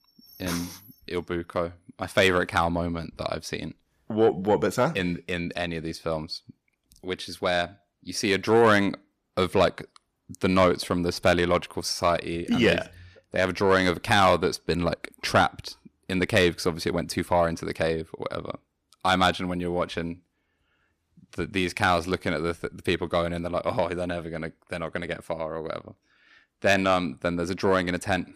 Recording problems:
distortion; slight; 10 dB below the speech

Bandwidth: 15 kHz